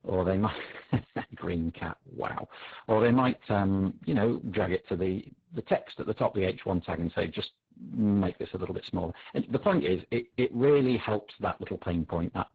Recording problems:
garbled, watery; badly
distortion; slight; 10 dB below the speech

